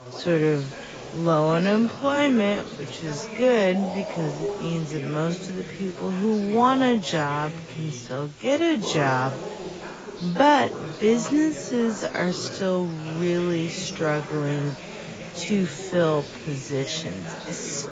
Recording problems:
garbled, watery; badly; nothing above 7.5 kHz
wrong speed, natural pitch; too slow; 0.5 times normal speed
voice in the background; noticeable; throughout; 15 dB below the speech
hiss; faint; throughout; 20 dB below the speech

